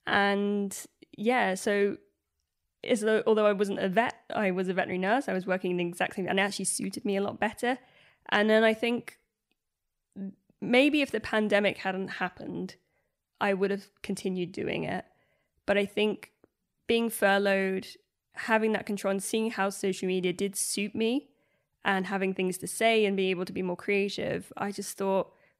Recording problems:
none

